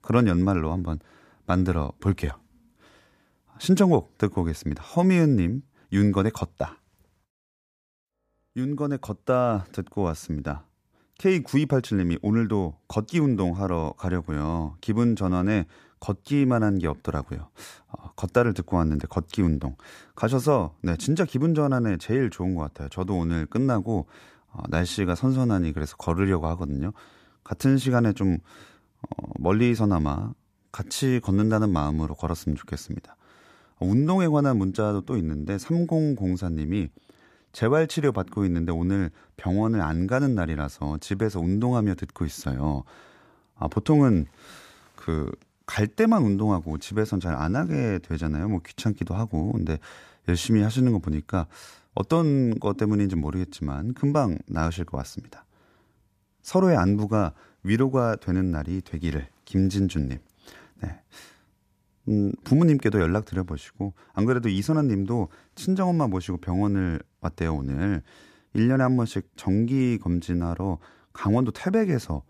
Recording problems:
none

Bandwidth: 14.5 kHz